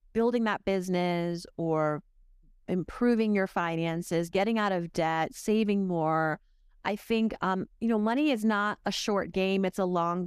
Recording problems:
abrupt cut into speech; at the end

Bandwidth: 14.5 kHz